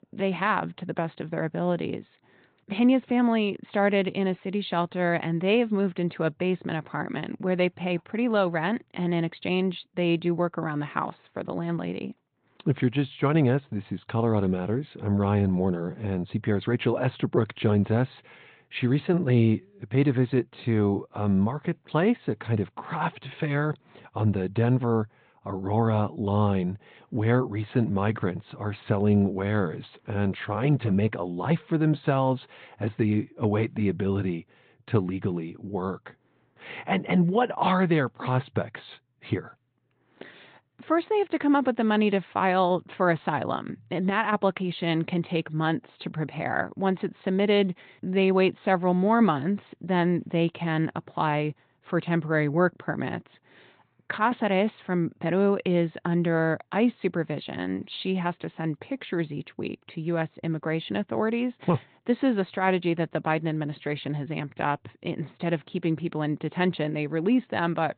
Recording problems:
high frequencies cut off; severe; nothing above 4 kHz
garbled, watery; slightly

